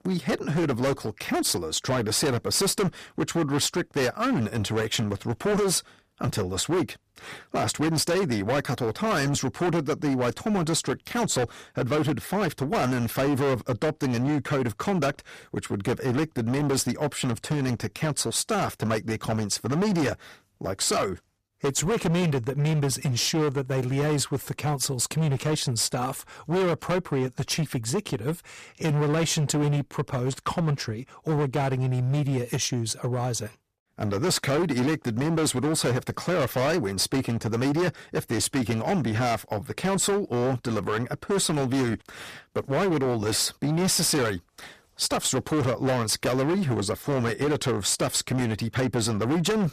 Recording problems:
distortion; heavy; 19% of the sound clipped

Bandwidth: 14.5 kHz